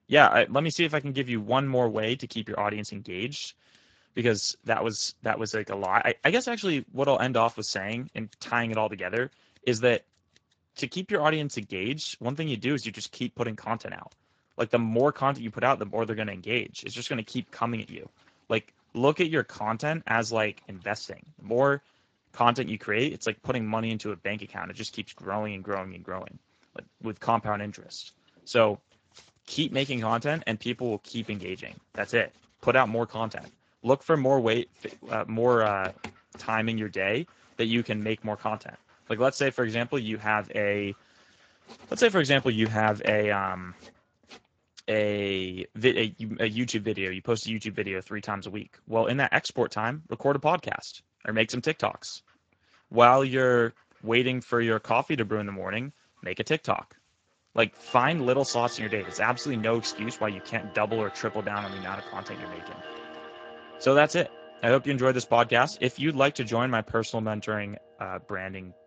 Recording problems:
garbled, watery; slightly; nothing above 7.5 kHz
household noises; noticeable; throughout; 20 dB below the speech

